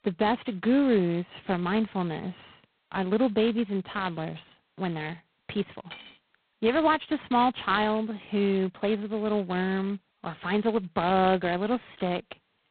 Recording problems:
phone-call audio; poor line; nothing above 4 kHz
clattering dishes; faint; at 6 s; peak 15 dB below the speech

